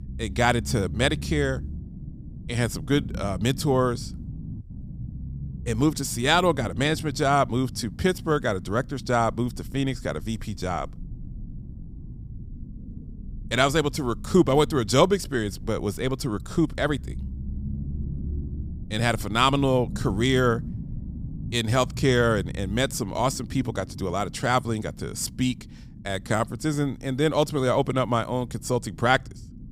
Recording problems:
low rumble; faint; throughout; 25 dB below the speech

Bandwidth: 15.5 kHz